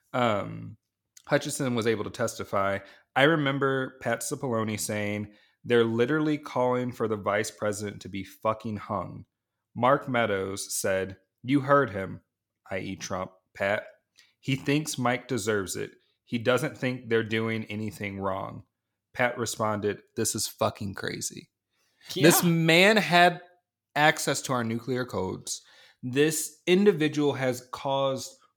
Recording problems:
none

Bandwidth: 18.5 kHz